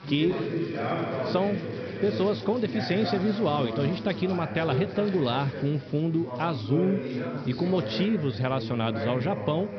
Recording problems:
high frequencies cut off; noticeable; nothing above 5.5 kHz
background chatter; loud; throughout; 3 voices, 5 dB below the speech
electrical hum; noticeable; throughout; 60 Hz, 20 dB below the speech

